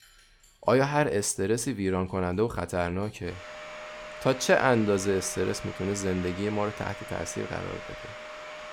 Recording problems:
household noises; noticeable; throughout; 15 dB below the speech

